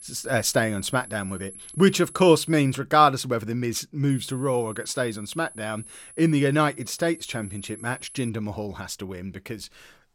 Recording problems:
high-pitched whine; noticeable; until 2.5 s and from 4 to 8.5 s; 11 kHz, 15 dB below the speech

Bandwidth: 16.5 kHz